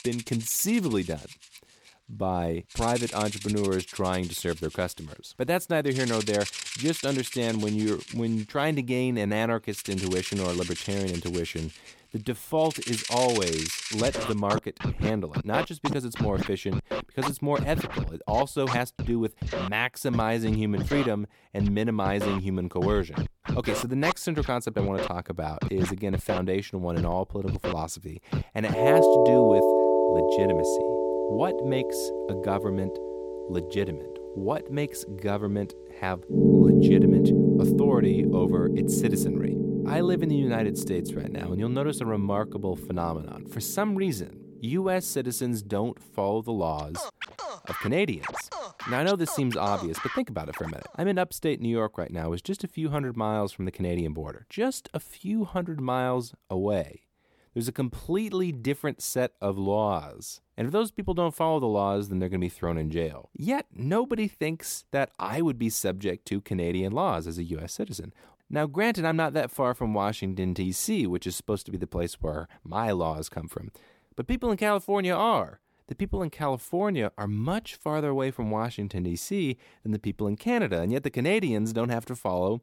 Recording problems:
background music; very loud; until 51 s; 1 dB above the speech

